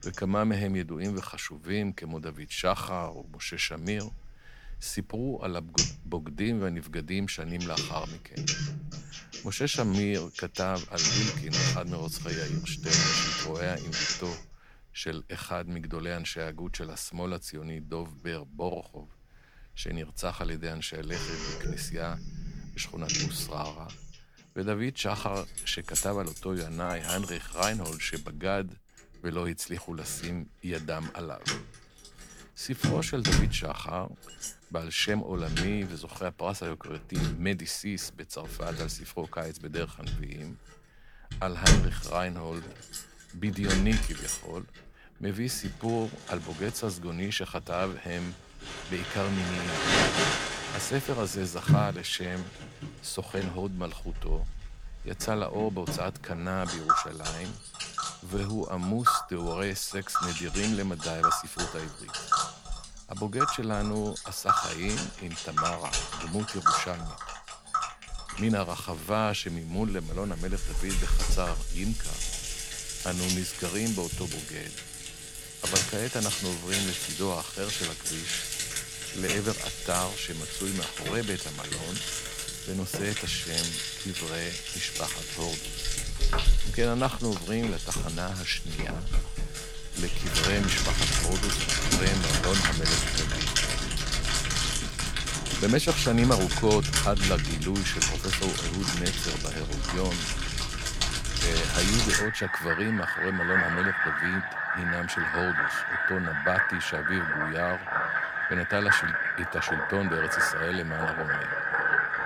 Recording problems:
household noises; very loud; throughout; 4 dB above the speech

